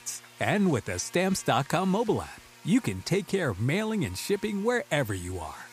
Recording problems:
electrical hum; noticeable; throughout; 60 Hz, 20 dB below the speech

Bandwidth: 15 kHz